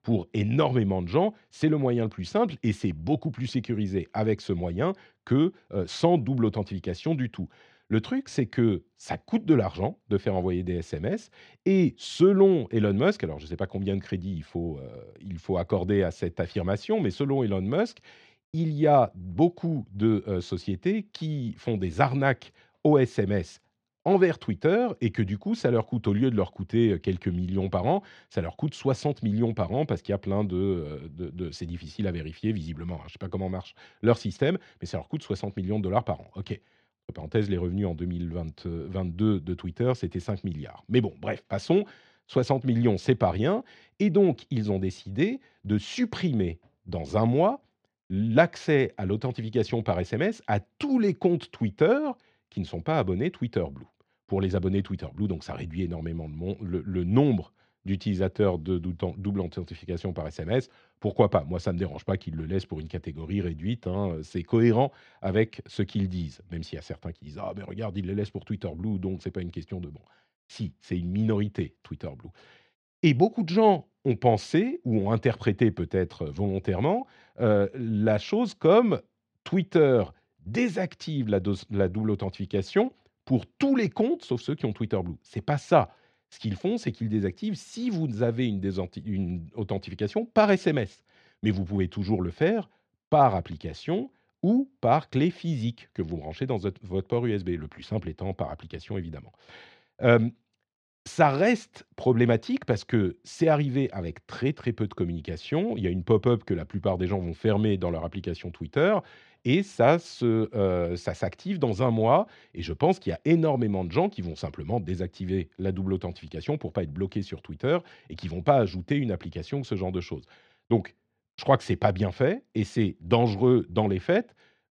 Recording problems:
muffled; slightly; fading above 3 kHz

